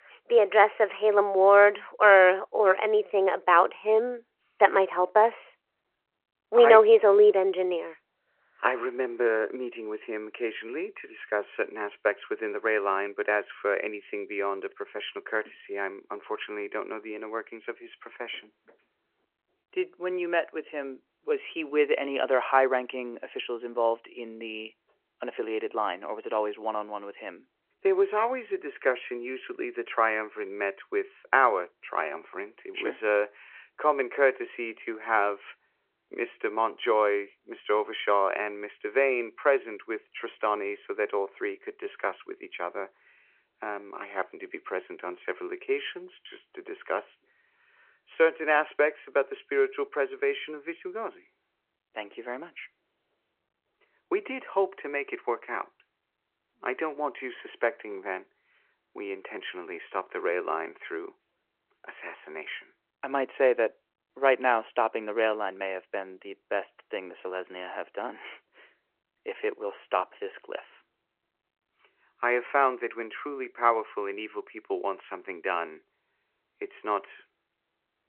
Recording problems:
phone-call audio

